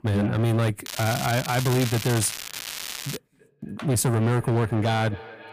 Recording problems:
distortion; heavy; 13% of the sound clipped
echo of what is said; faint; from 3 s on; 260 ms later, 20 dB below the speech
crackling; loud; from 1 to 3 s; 8 dB below the speech

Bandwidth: 15 kHz